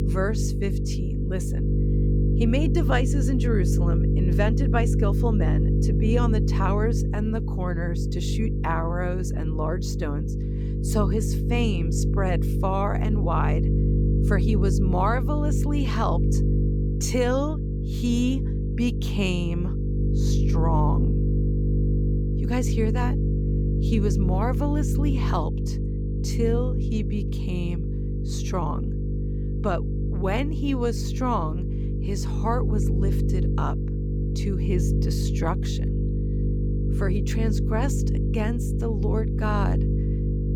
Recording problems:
electrical hum; loud; throughout; 50 Hz, 5 dB below the speech

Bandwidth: 18 kHz